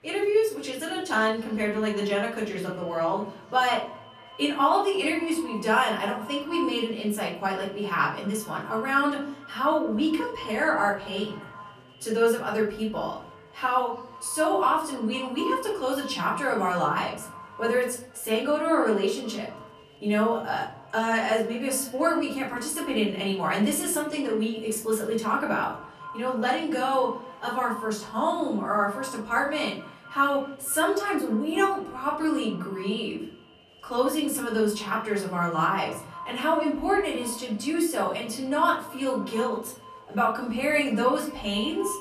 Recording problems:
off-mic speech; far
echo of what is said; faint; throughout; 240 ms later, 20 dB below the speech
room echo; slight; dies away in 0.7 s
chatter from many people; faint; throughout; 30 dB below the speech

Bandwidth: 14 kHz